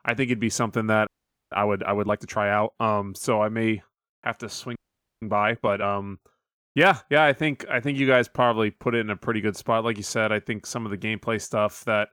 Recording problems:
audio freezing; at 1 s and at 5 s

